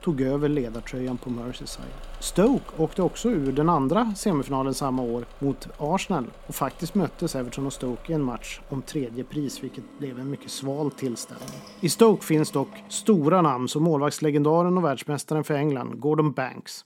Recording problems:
machinery noise; faint; until 13 s; 20 dB below the speech

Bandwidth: 16.5 kHz